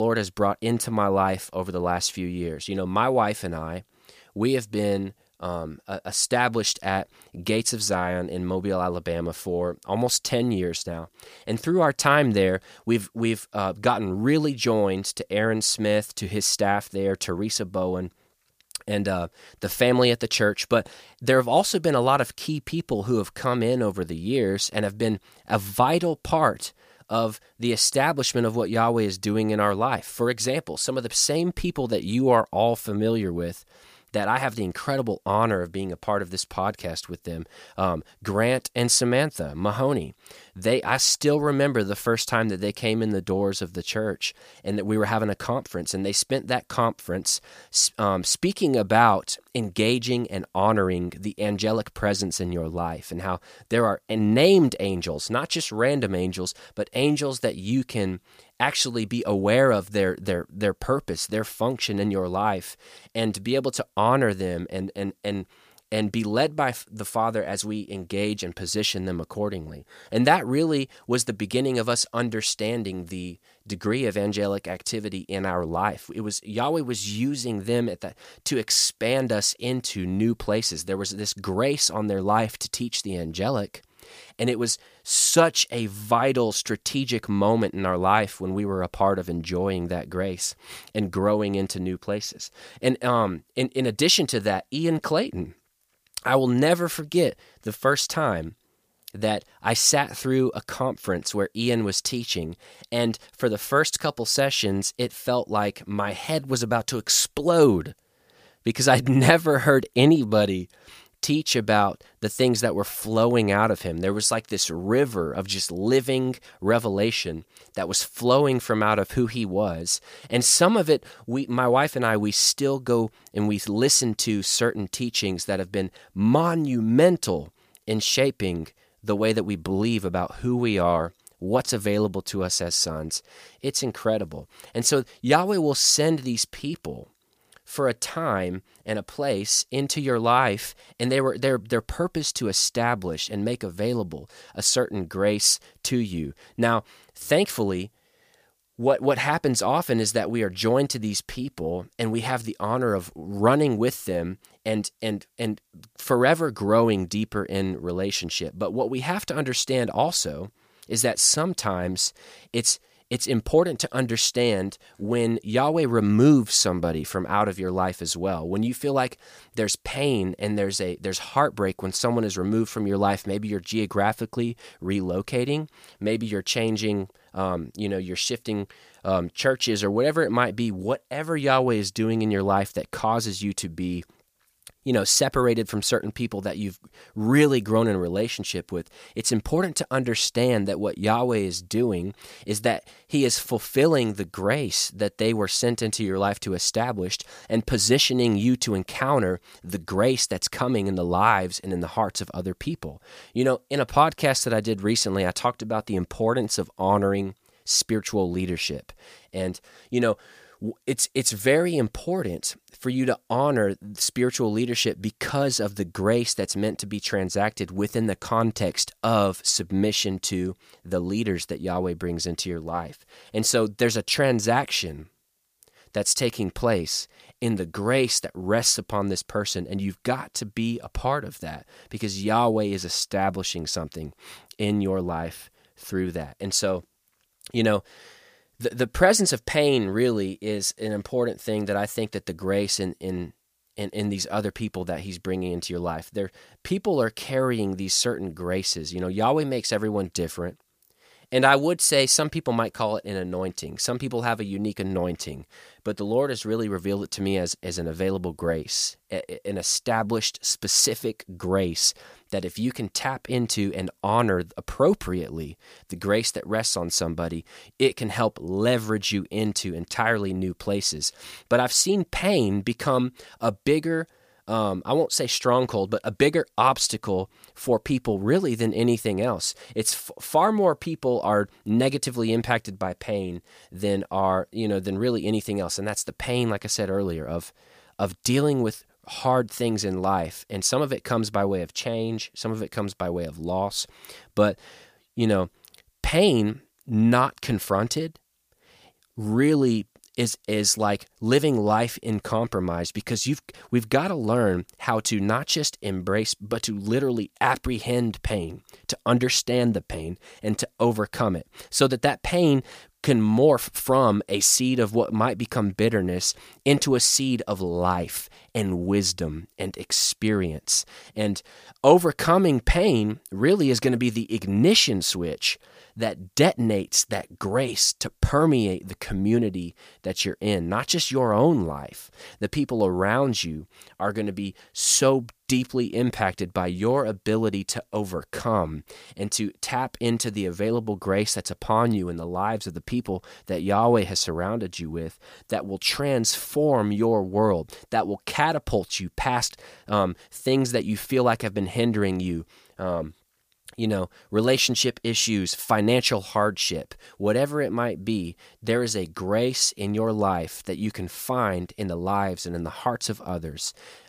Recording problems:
abrupt cut into speech; at the start

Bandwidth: 15 kHz